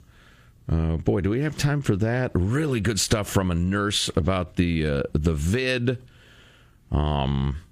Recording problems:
squashed, flat; somewhat

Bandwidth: 15 kHz